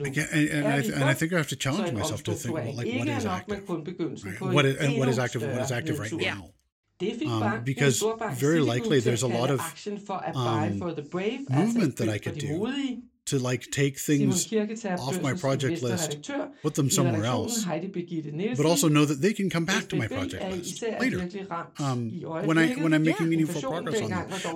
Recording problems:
voice in the background; loud; throughout; 5 dB below the speech

